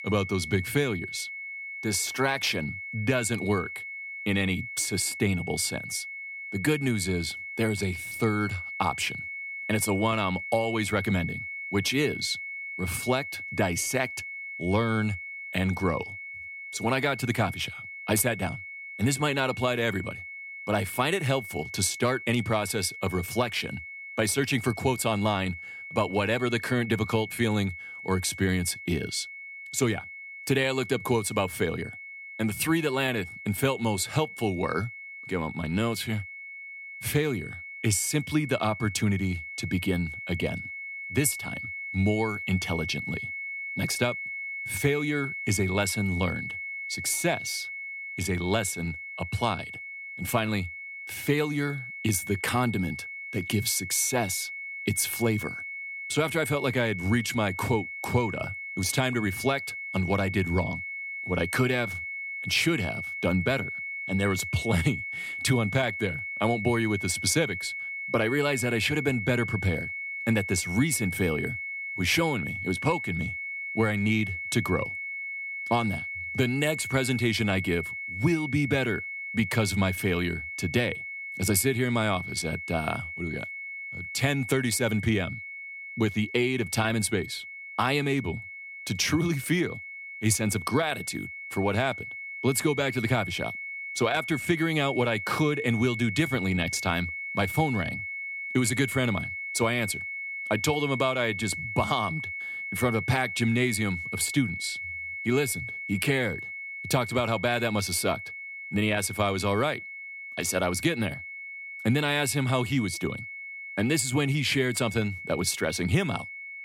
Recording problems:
high-pitched whine; loud; throughout; 2 kHz, 7 dB below the speech

